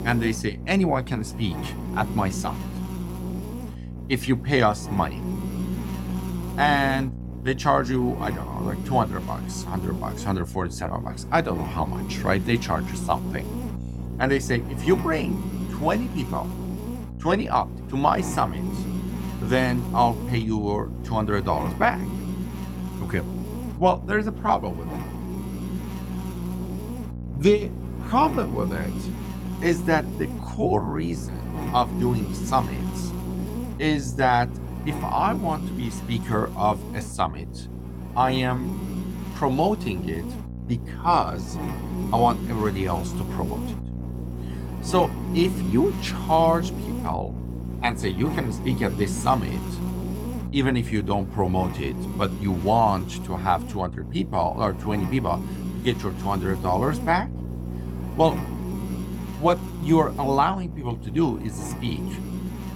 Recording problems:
electrical hum; noticeable; throughout; 60 Hz, 15 dB below the speech

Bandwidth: 16.5 kHz